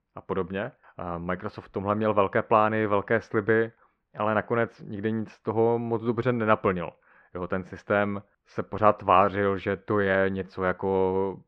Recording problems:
muffled; very; fading above 1.5 kHz

